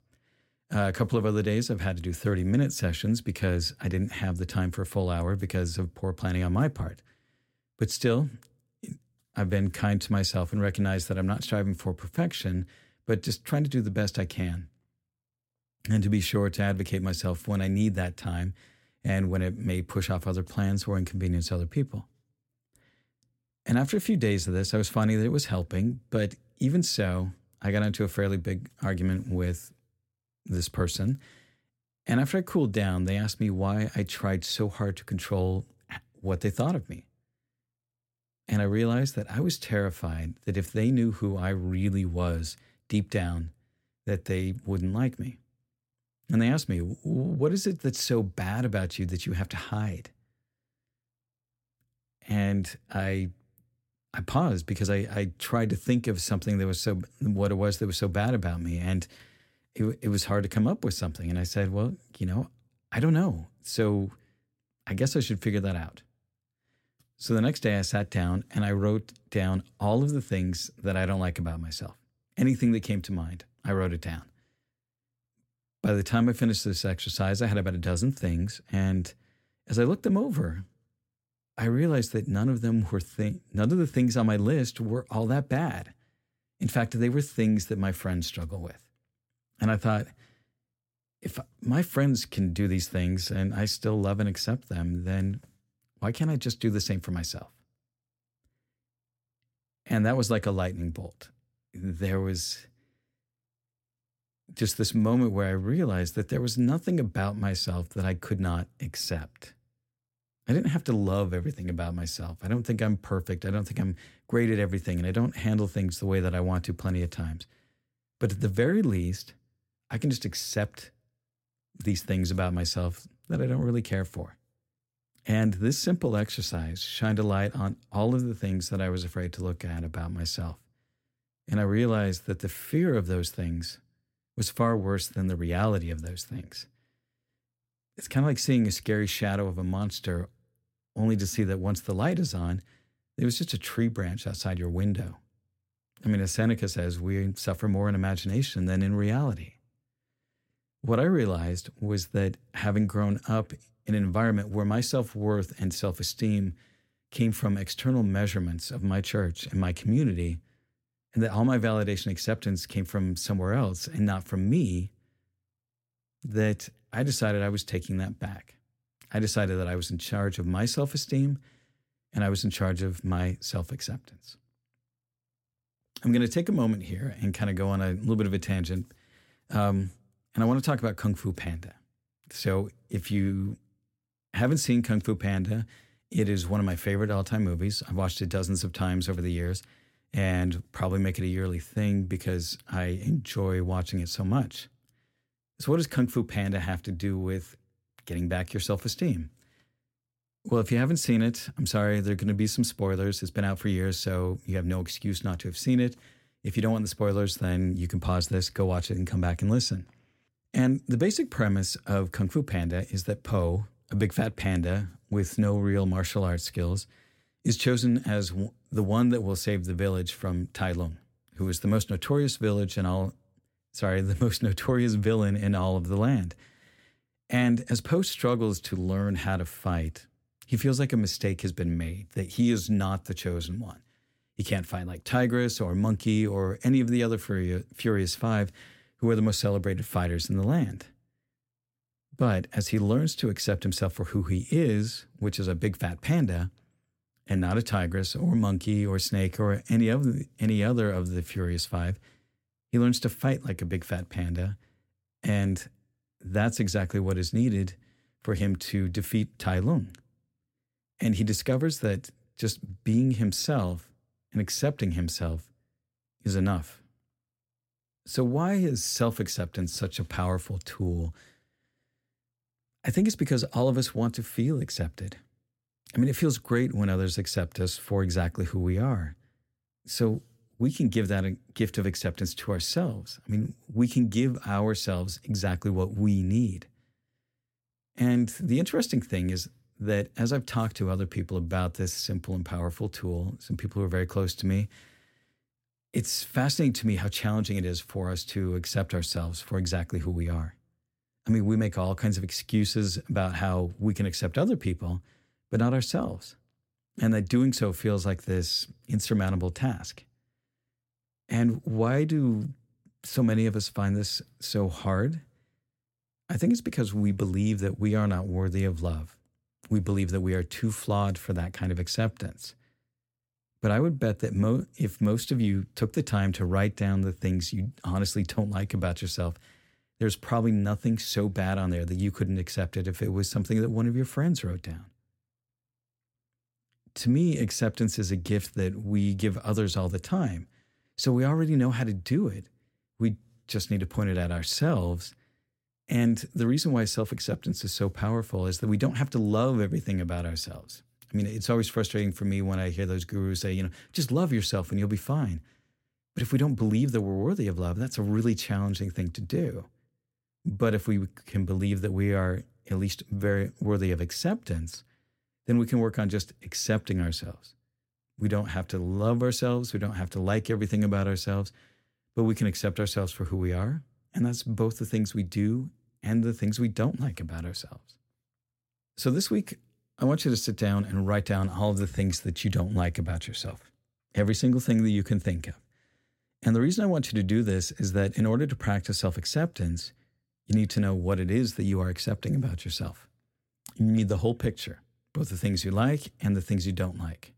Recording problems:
none

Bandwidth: 16.5 kHz